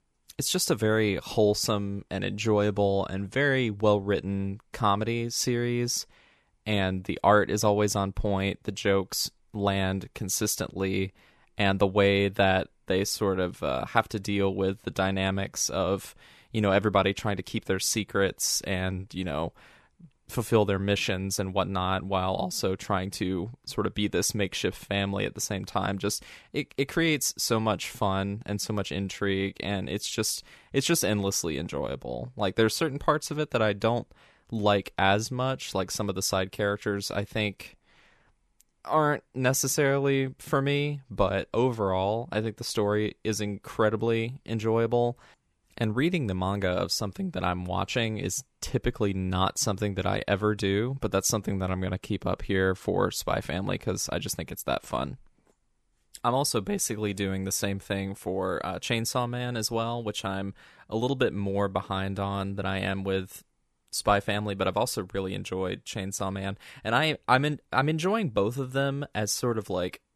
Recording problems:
none

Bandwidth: 13.5 kHz